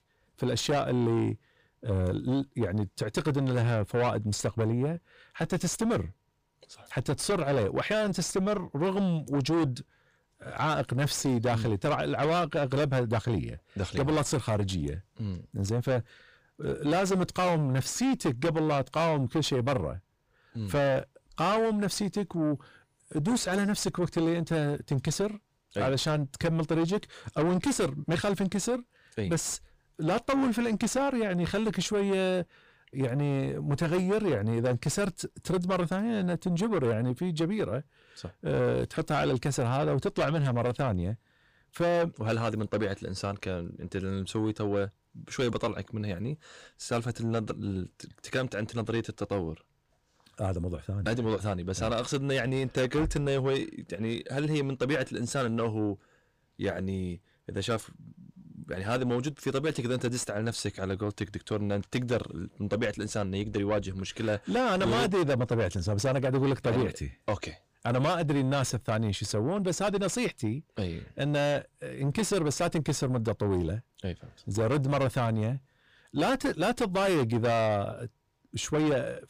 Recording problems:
distortion; heavy; 6 dB below the speech

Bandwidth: 15 kHz